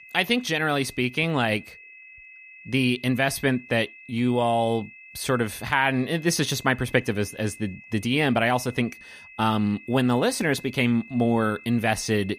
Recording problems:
high-pitched whine; noticeable; throughout; 2.5 kHz, 20 dB below the speech

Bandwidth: 15 kHz